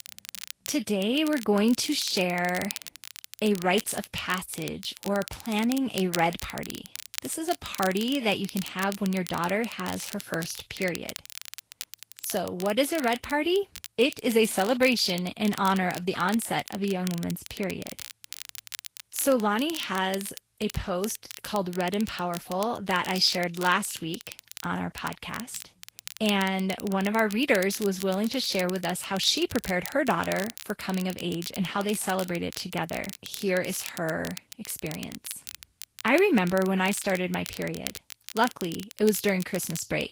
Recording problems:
garbled, watery; slightly; nothing above 15.5 kHz
crackle, like an old record; noticeable; 15 dB below the speech

